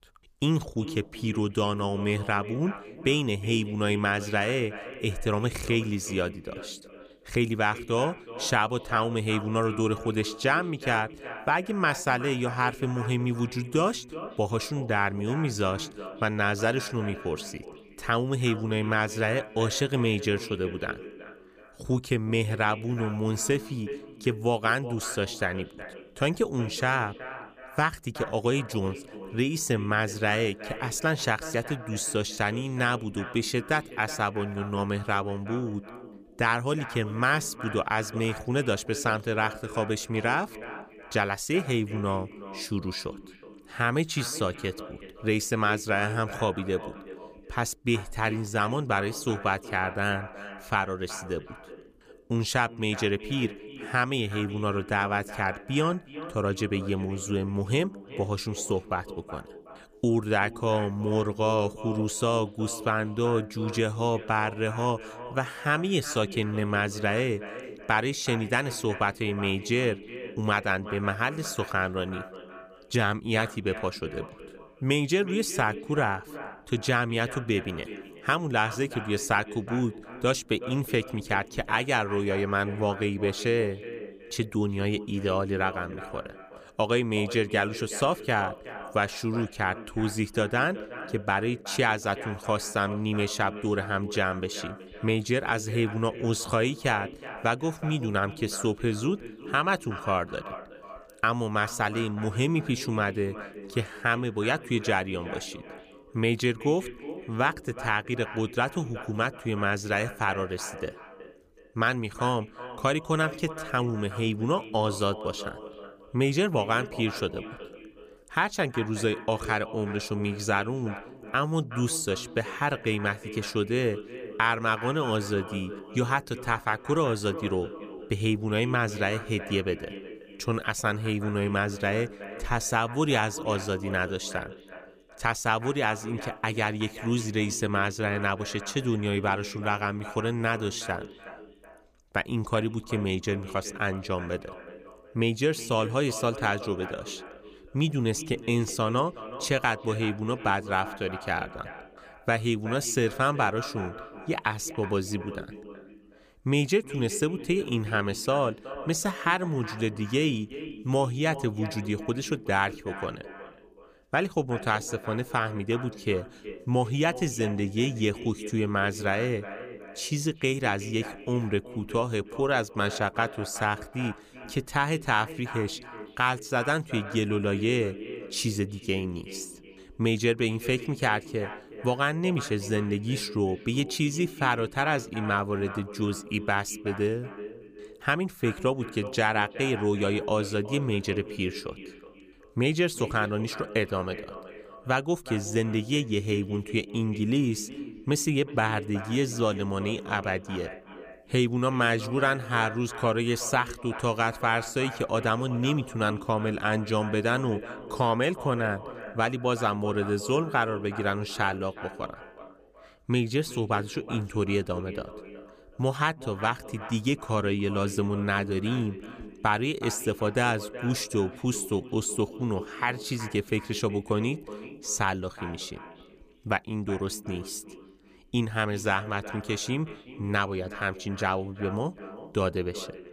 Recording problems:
echo of what is said; noticeable; throughout; 370 ms later, 15 dB below the speech

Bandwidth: 15 kHz